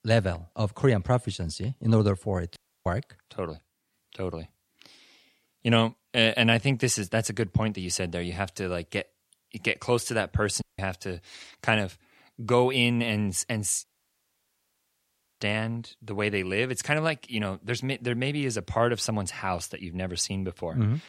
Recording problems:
audio cutting out; at 2.5 s, at 11 s and at 14 s for 1.5 s

